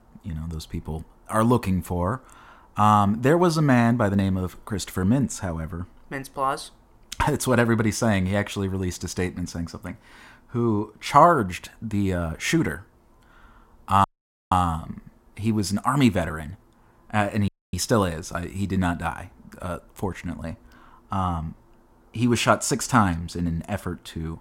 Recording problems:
audio cutting out; at 14 s and at 17 s

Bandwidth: 16 kHz